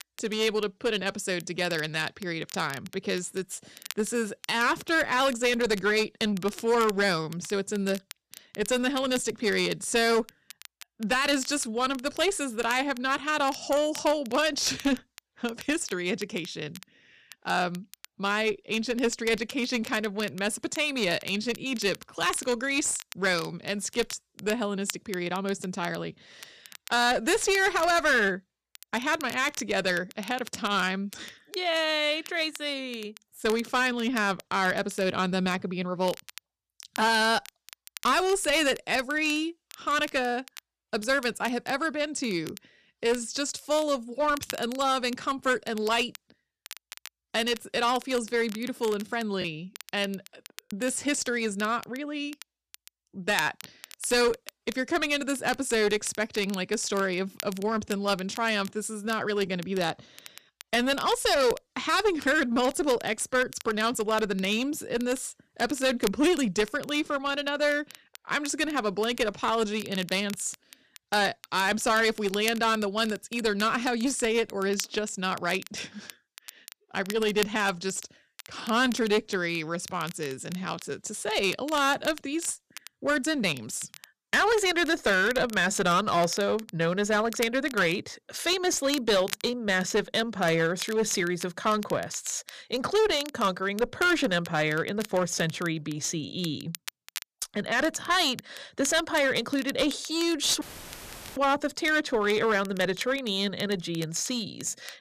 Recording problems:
distortion; slight; 7% of the sound clipped
crackle, like an old record; noticeable; 20 dB below the speech
choppy; very; from 49 to 51 s; 5% of the speech affected
audio cutting out; filled with static; at 1:41 for 1 s

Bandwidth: 14.5 kHz